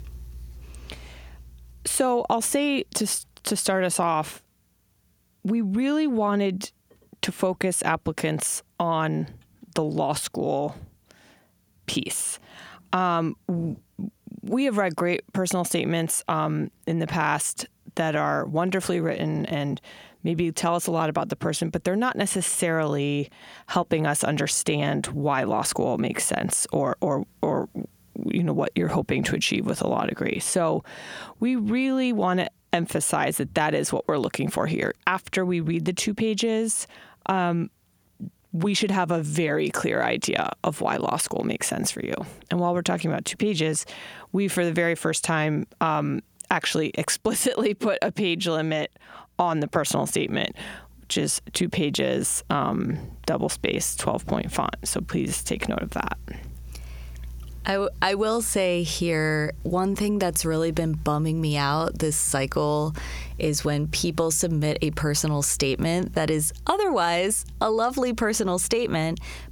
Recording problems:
squashed, flat; heavily

